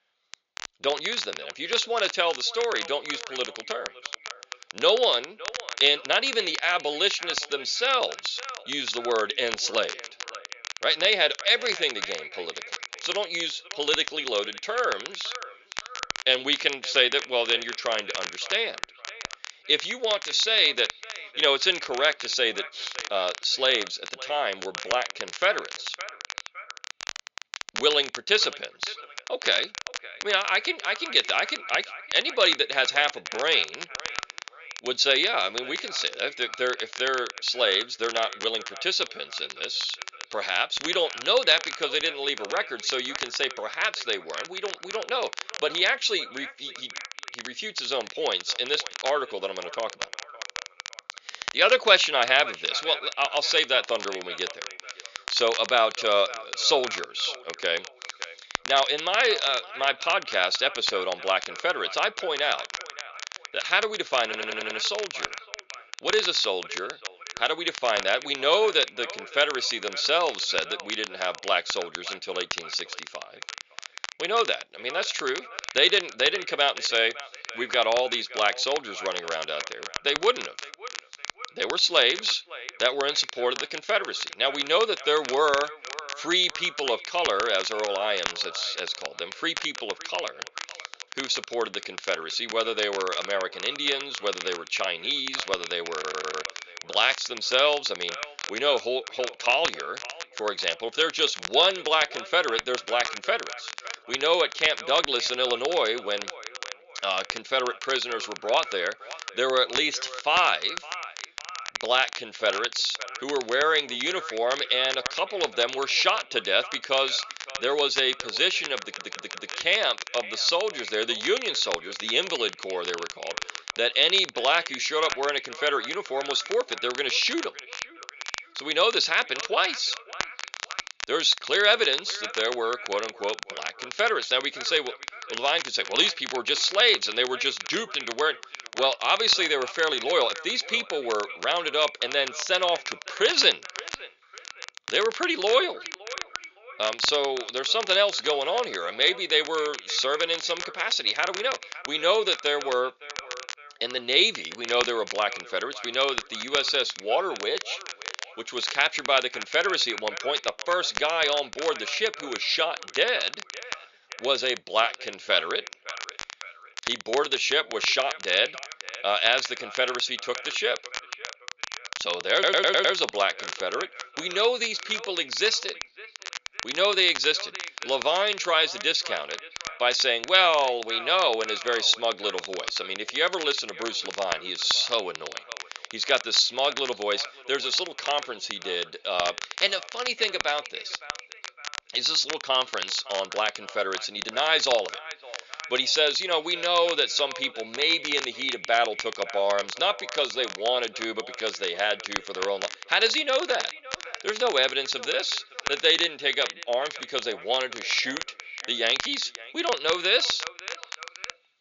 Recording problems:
thin; somewhat; fading below 450 Hz
high frequencies cut off; noticeable; nothing above 7 kHz
echo of what is said; faint; throughout; 560 ms later, 20 dB below the speech
crackle, like an old record; noticeable; 10 dB below the speech
audio stuttering; 4 times, first at 1:04

